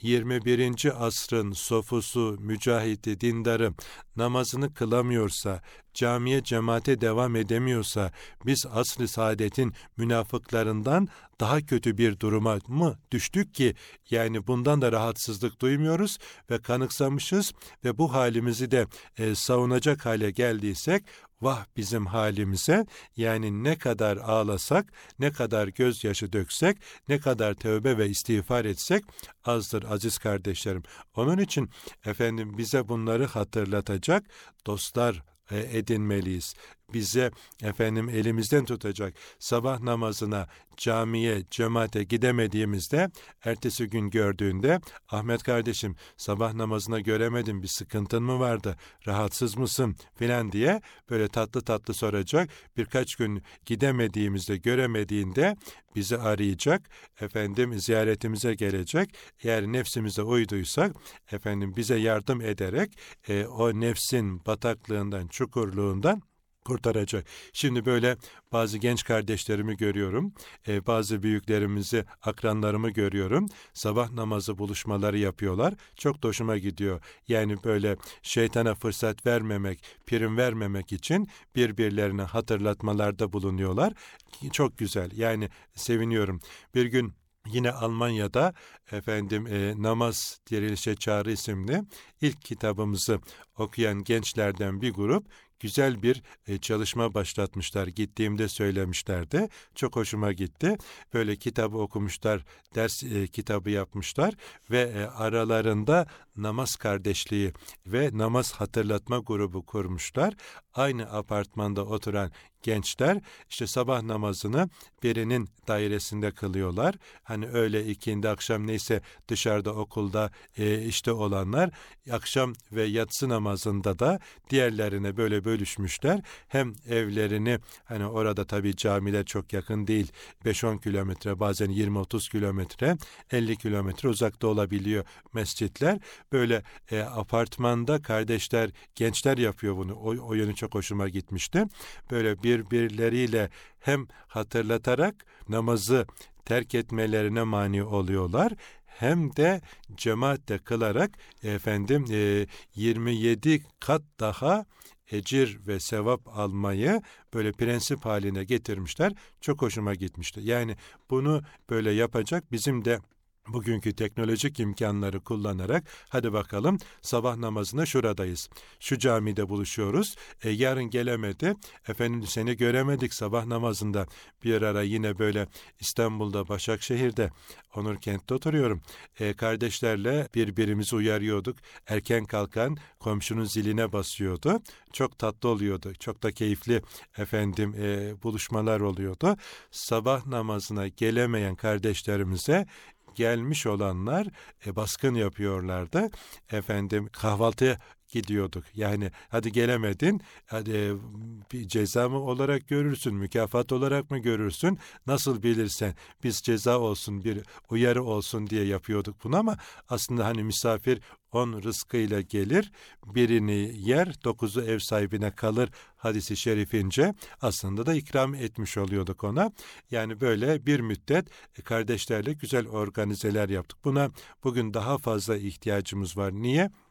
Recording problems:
none

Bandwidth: 18 kHz